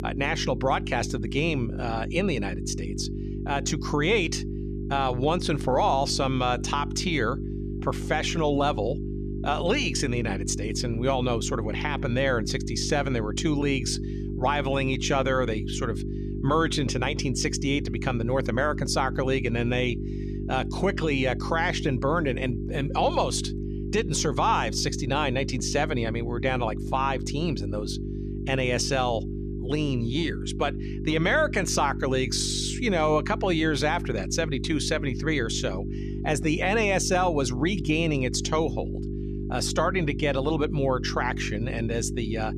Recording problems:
electrical hum; noticeable; throughout; 50 Hz, 10 dB below the speech

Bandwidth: 14 kHz